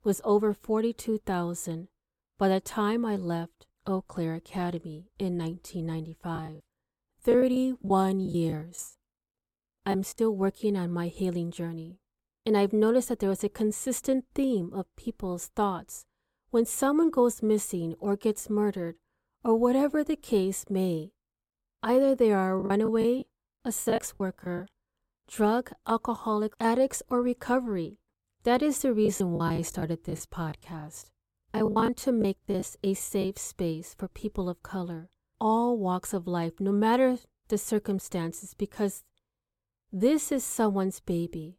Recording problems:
choppy; very; from 6.5 to 10 s, from 23 to 25 s and from 29 to 33 s; 16% of the speech affected

